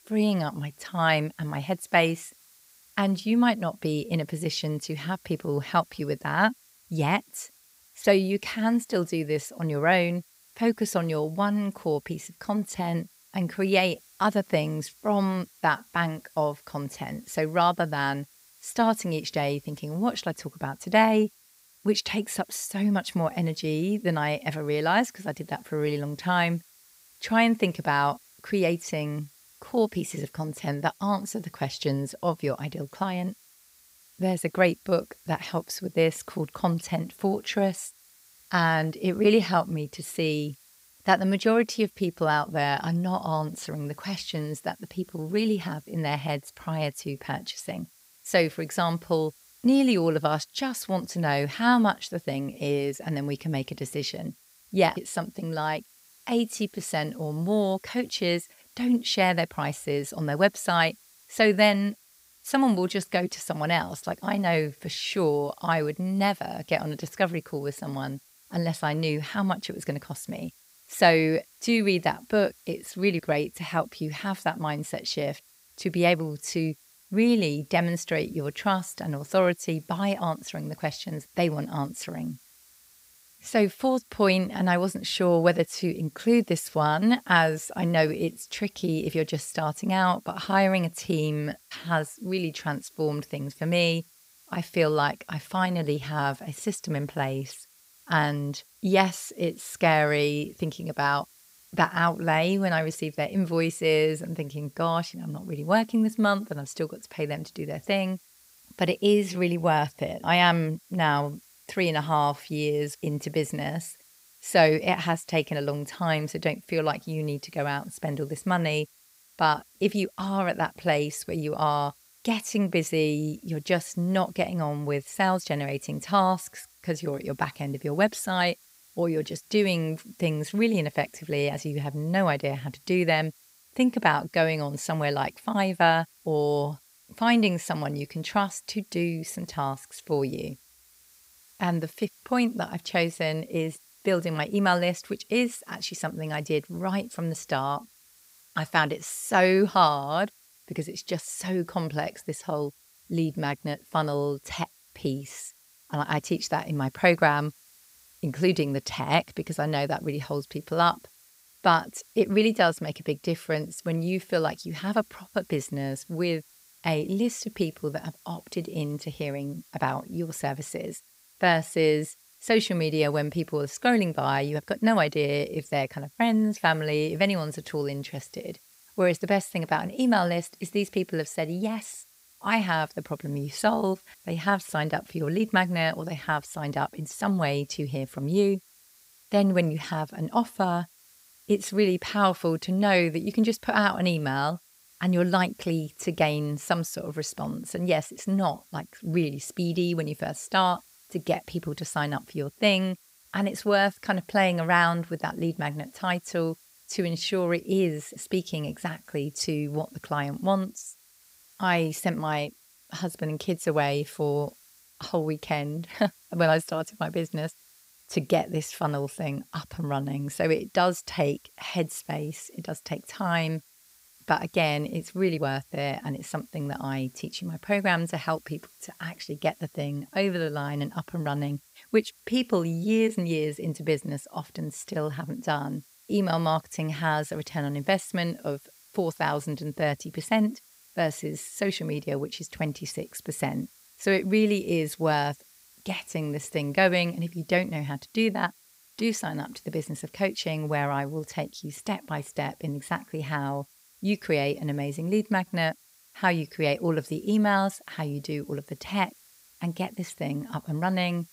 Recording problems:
hiss; faint; throughout; 30 dB below the speech

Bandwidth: 15.5 kHz